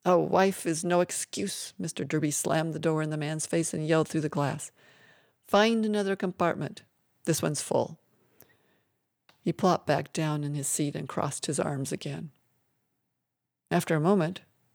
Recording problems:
none

